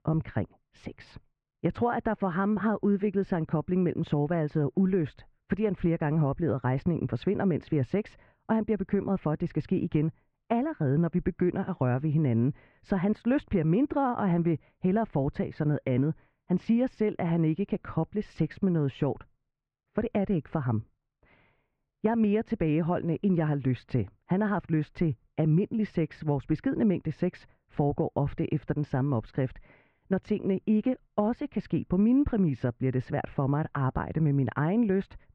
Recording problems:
muffled; very; fading above 2 kHz

